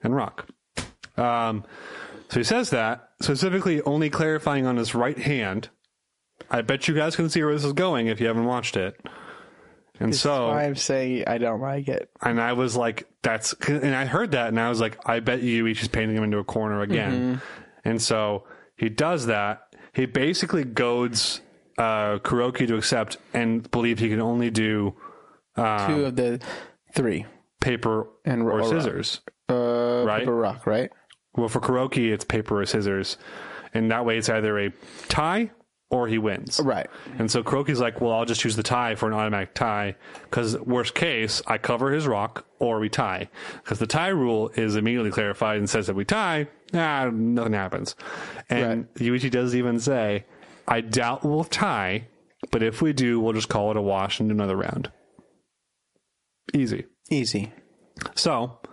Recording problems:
squashed, flat; heavily
garbled, watery; slightly; nothing above 11 kHz

